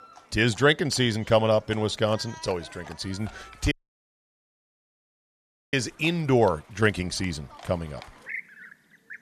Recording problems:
animal sounds; noticeable; throughout; 20 dB below the speech
audio cutting out; at 3.5 s for 2 s

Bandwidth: 13.5 kHz